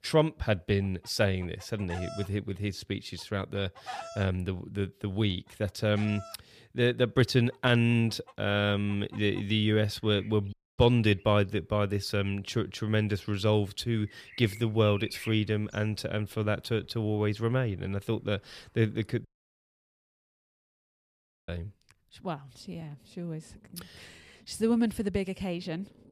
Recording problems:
animal sounds; noticeable; throughout; 20 dB below the speech
audio cutting out; at 11 s and at 19 s for 2 s

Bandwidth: 15 kHz